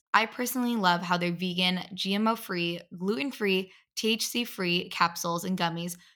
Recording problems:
none

